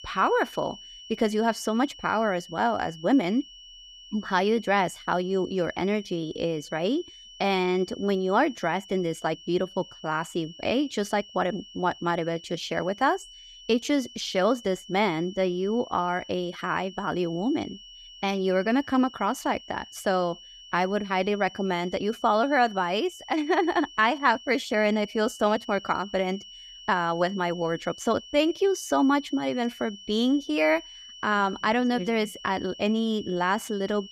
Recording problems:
high-pitched whine; noticeable; throughout; 3 kHz, 15 dB below the speech

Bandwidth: 14.5 kHz